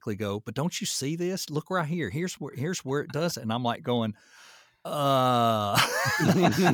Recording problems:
abrupt cut into speech; at the end

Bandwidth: 18.5 kHz